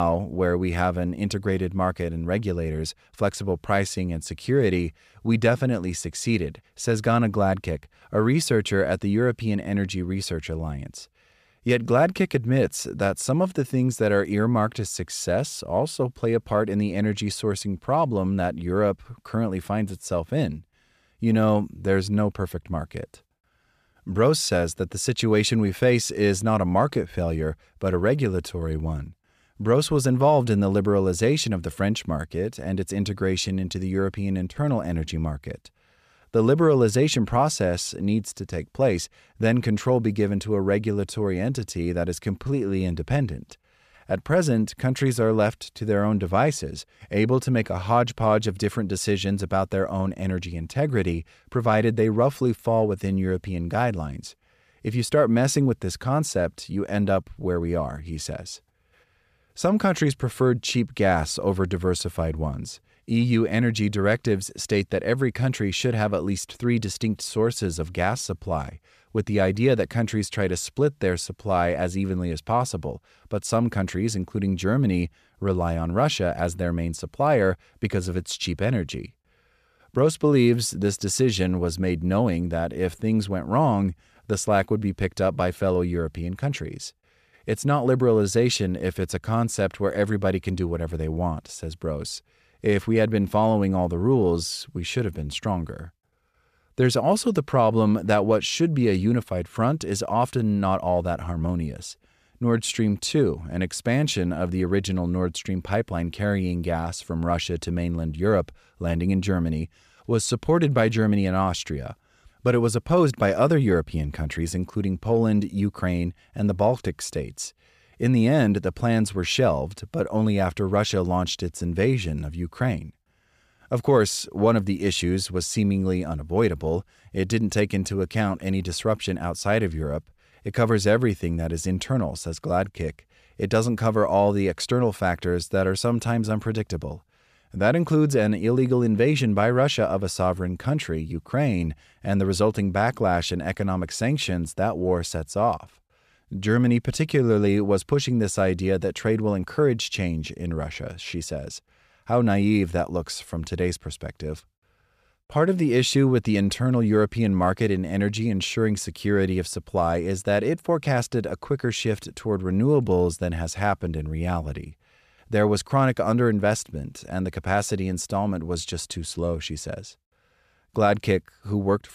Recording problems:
abrupt cut into speech; at the start

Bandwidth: 14.5 kHz